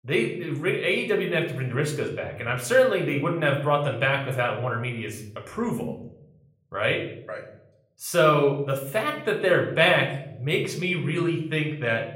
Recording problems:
room echo; slight; dies away in 0.7 s
off-mic speech; somewhat distant

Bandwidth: 16 kHz